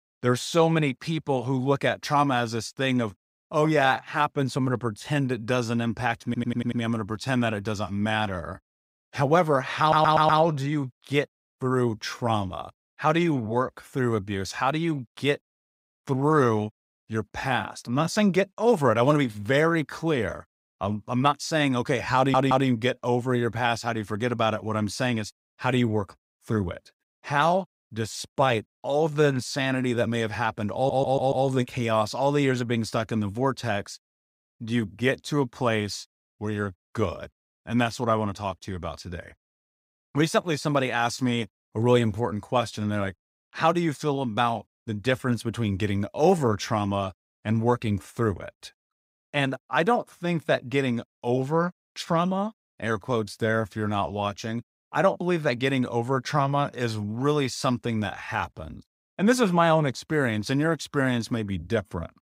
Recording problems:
audio stuttering; 4 times, first at 6.5 s

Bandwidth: 15.5 kHz